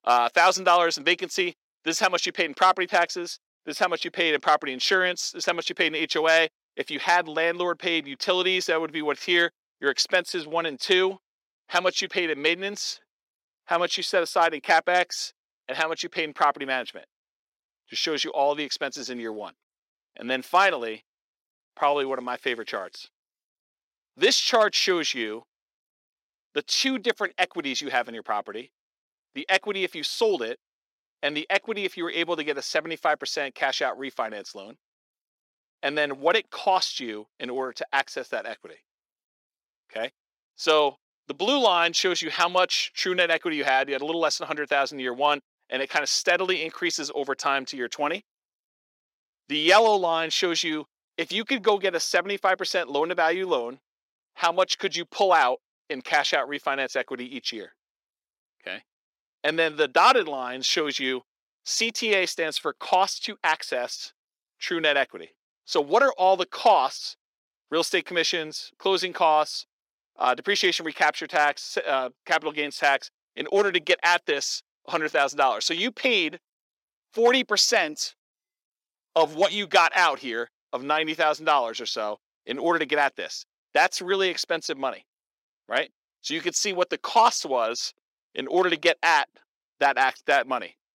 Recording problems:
thin; somewhat; fading below 350 Hz

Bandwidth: 16 kHz